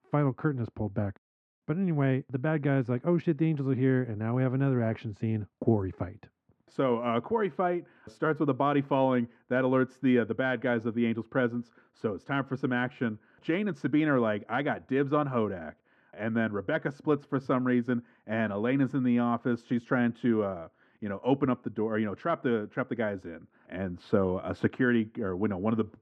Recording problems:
muffled; very; fading above 1.5 kHz

